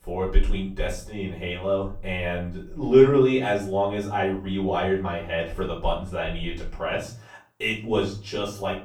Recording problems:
off-mic speech; far
room echo; slight; dies away in 0.4 s

